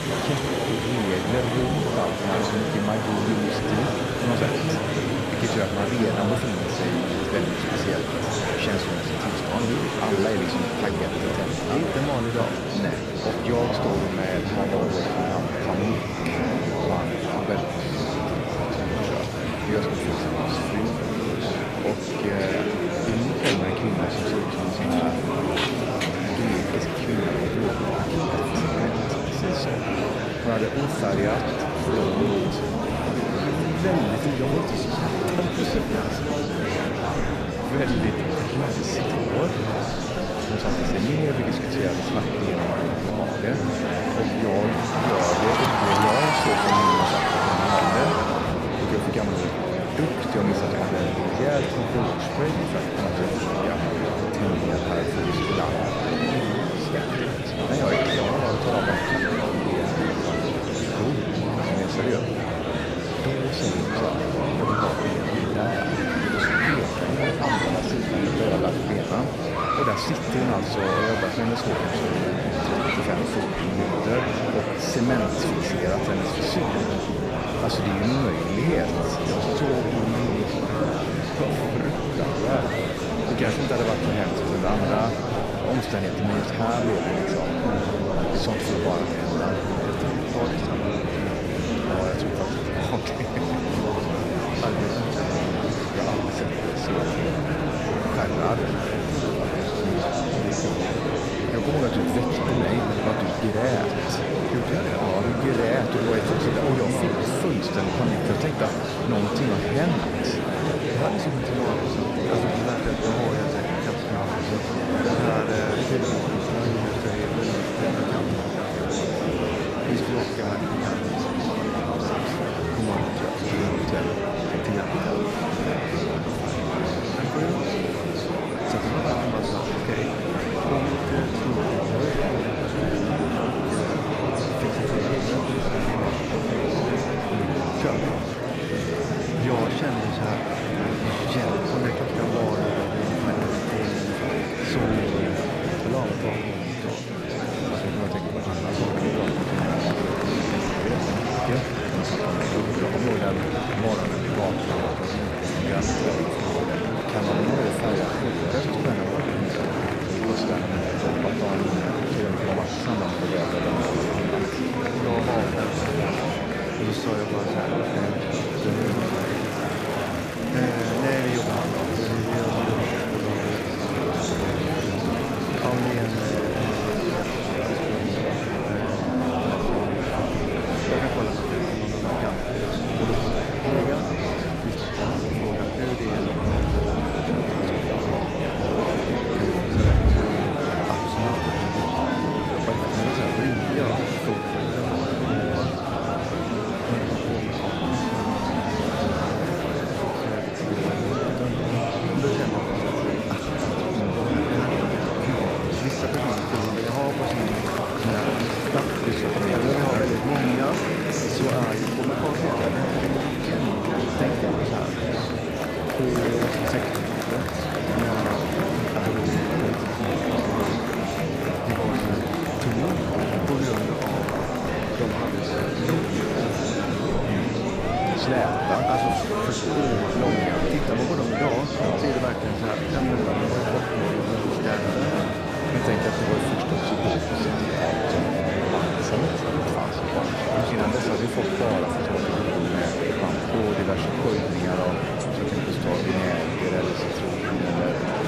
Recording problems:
murmuring crowd; very loud; throughout; 4 dB above the speech

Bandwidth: 14.5 kHz